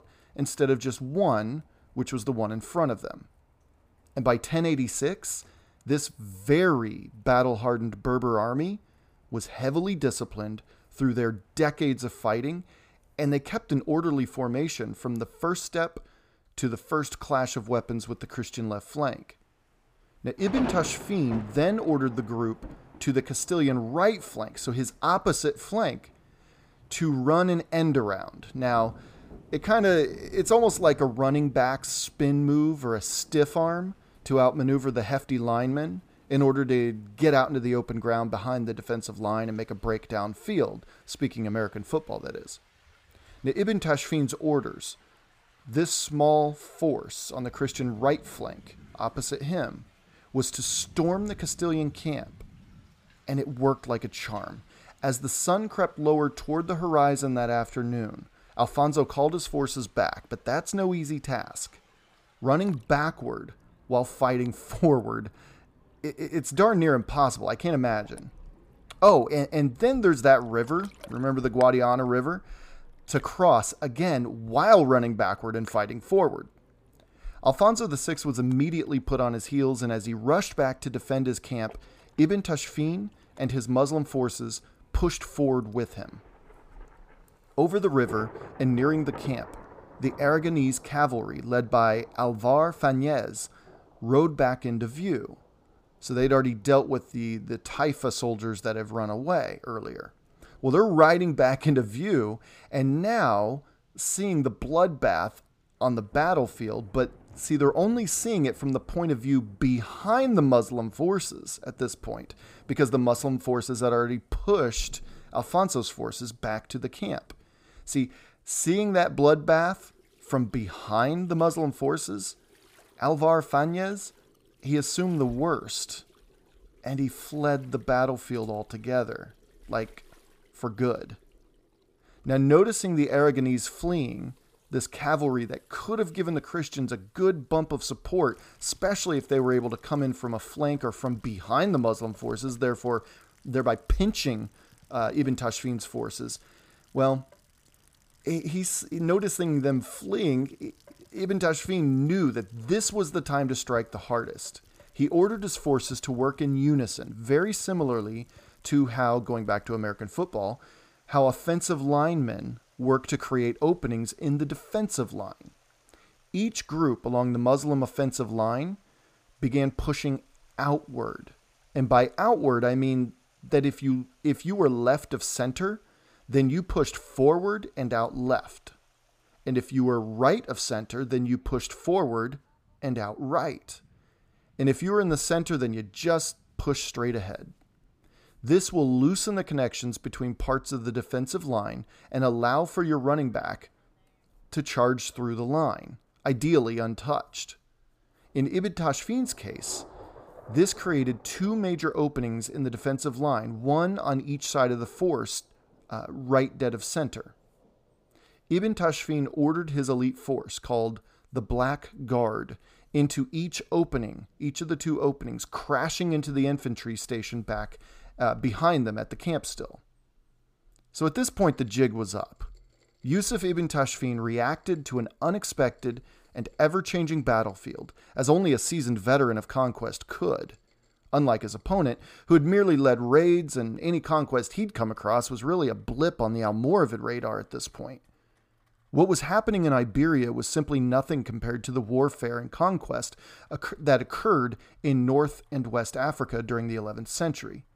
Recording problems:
rain or running water; faint; throughout; 25 dB below the speech

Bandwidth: 15 kHz